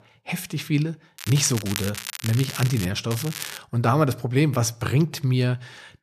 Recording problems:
crackling; loud; from 1 to 3 s and at 3 s; 9 dB below the speech

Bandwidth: 14.5 kHz